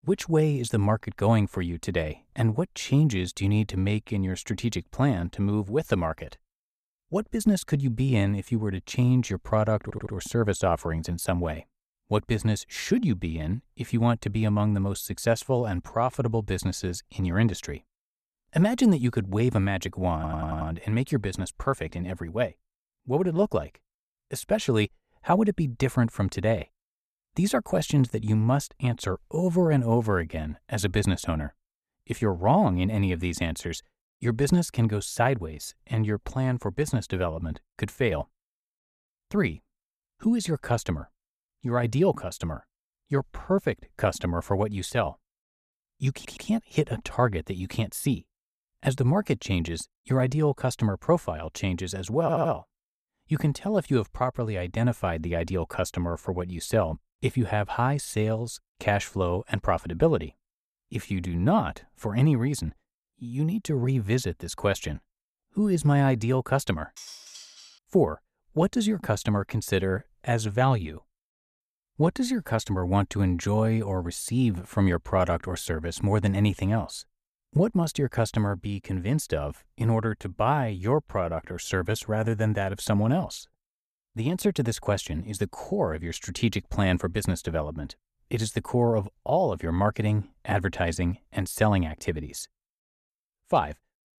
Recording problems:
audio stuttering; 4 times, first at 10 s
clattering dishes; faint; at 1:07; peak 15 dB below the speech

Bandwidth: 14 kHz